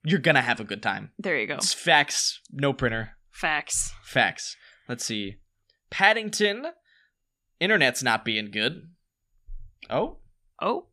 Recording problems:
none

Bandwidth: 14.5 kHz